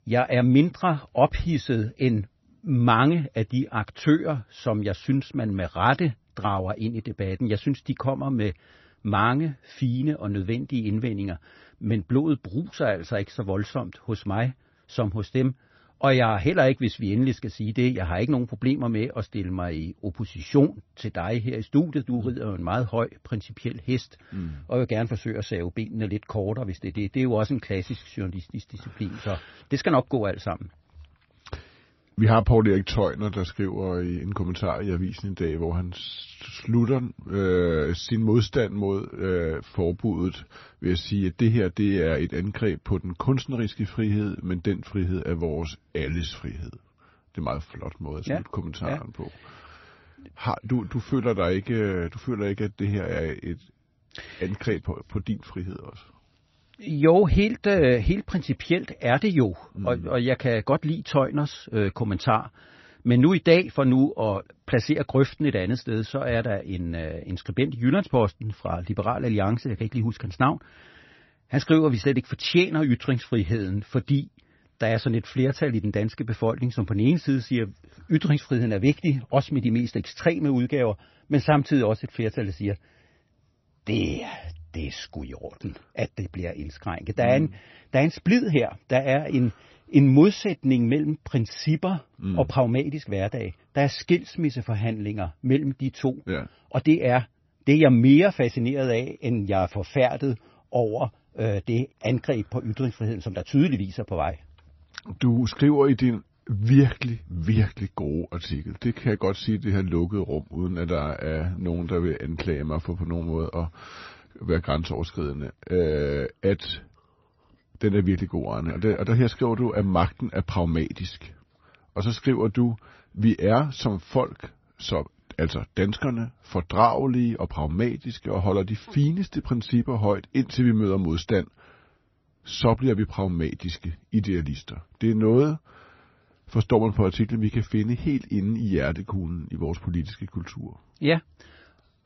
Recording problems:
garbled, watery; slightly; nothing above 6 kHz

